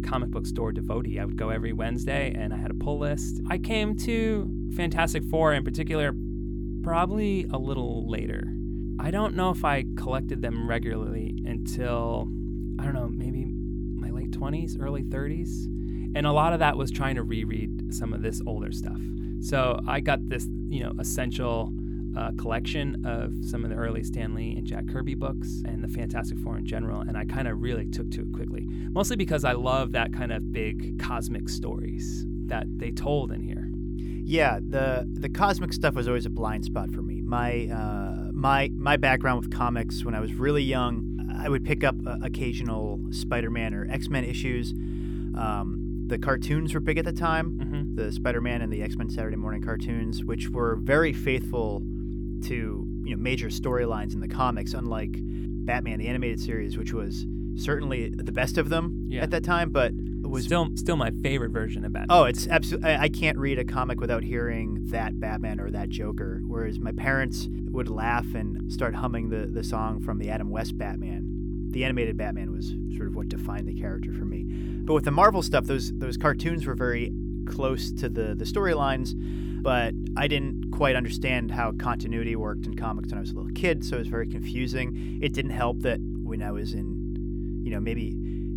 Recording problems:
electrical hum; noticeable; throughout; 50 Hz, 10 dB below the speech

